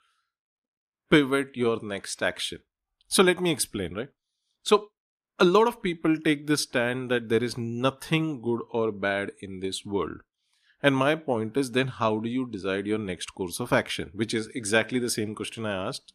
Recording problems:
none

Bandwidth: 14.5 kHz